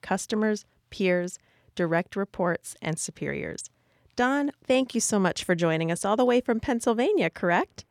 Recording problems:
none

